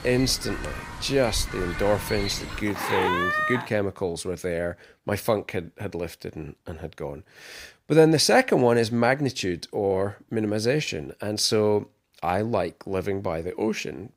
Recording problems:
animal sounds; loud; until 3.5 s; 5 dB below the speech

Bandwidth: 15.5 kHz